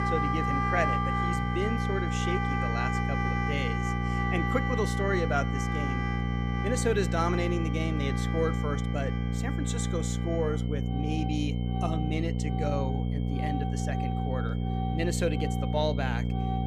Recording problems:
electrical hum; loud; throughout; 60 Hz, 6 dB below the speech
background music; loud; throughout; 2 dB below the speech
high-pitched whine; noticeable; throughout; 3 kHz, 15 dB below the speech

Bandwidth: 15 kHz